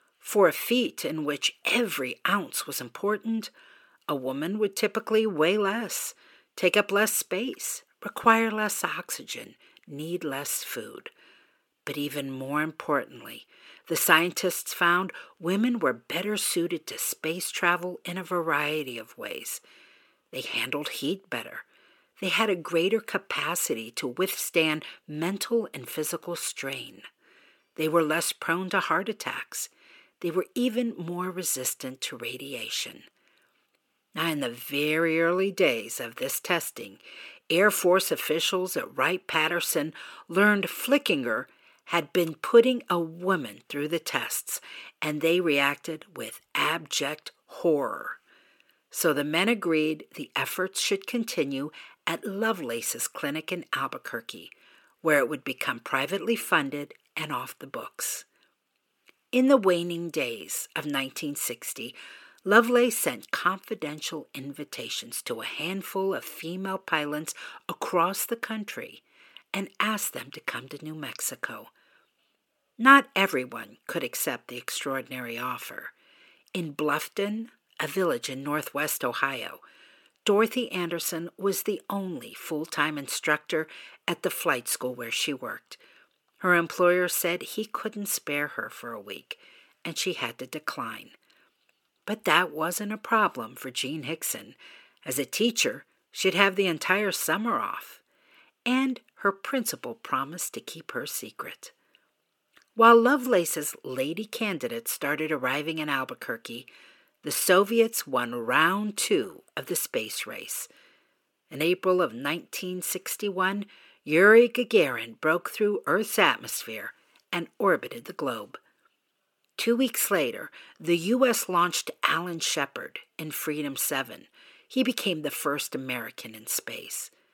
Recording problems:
thin; somewhat; fading below 350 Hz

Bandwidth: 17.5 kHz